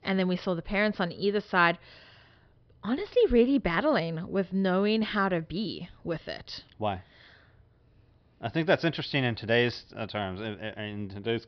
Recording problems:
high frequencies cut off; noticeable; nothing above 5.5 kHz

